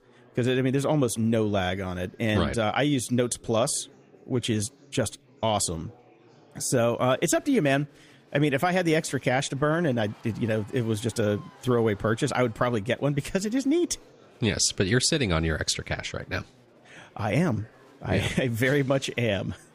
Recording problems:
chatter from many people; faint; throughout; 30 dB below the speech

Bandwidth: 15 kHz